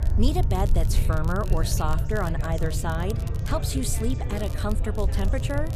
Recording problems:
background chatter; noticeable; throughout; 3 voices, 10 dB below the speech
low rumble; noticeable; throughout; 10 dB below the speech
crackle, like an old record; noticeable; 20 dB below the speech
background music; faint; throughout; 20 dB below the speech

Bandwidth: 14.5 kHz